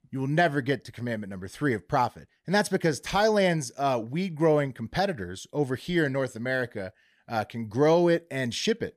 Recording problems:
none

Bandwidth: 14.5 kHz